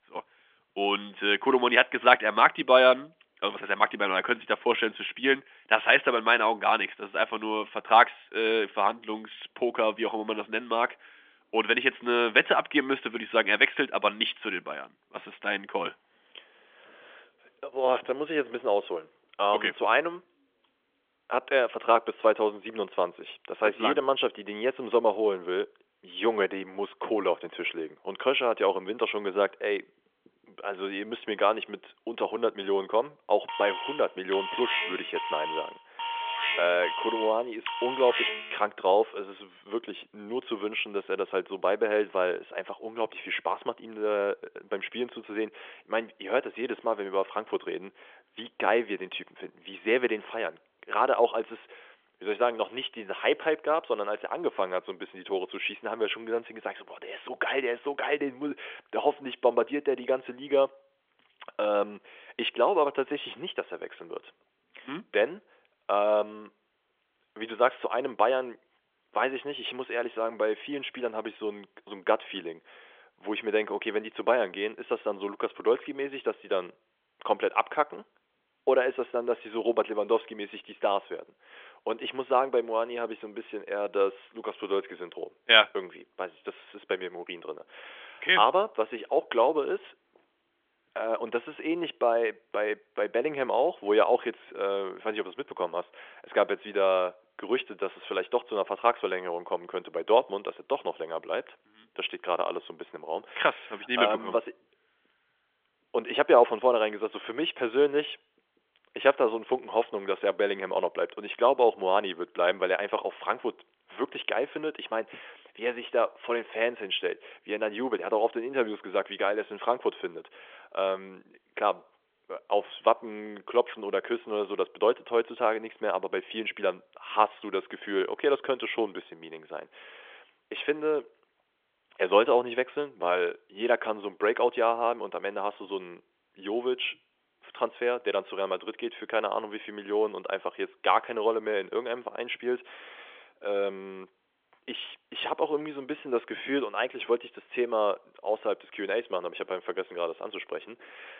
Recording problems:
phone-call audio; nothing above 3.5 kHz
alarm; loud; from 33 to 39 s; peak level with the speech

